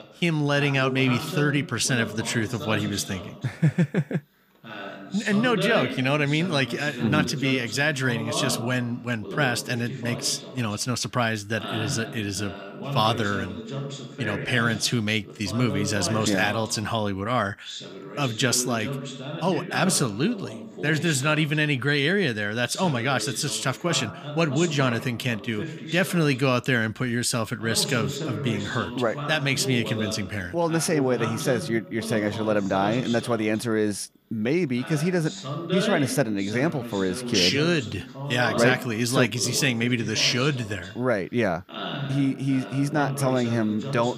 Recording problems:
voice in the background; loud; throughout; 9 dB below the speech

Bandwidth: 15 kHz